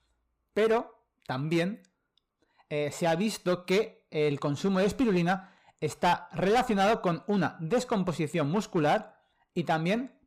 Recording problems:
distortion; slight; 6% of the sound clipped

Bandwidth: 15 kHz